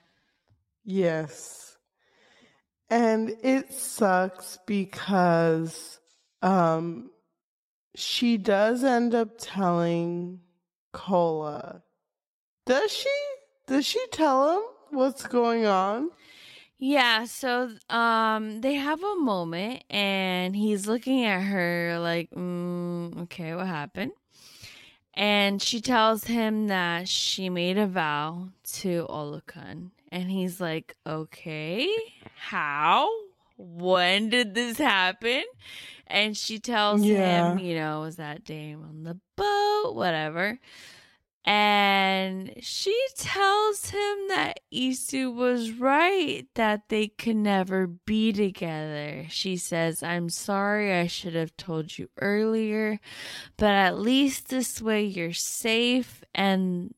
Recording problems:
wrong speed, natural pitch; too slow; 0.6 times normal speed

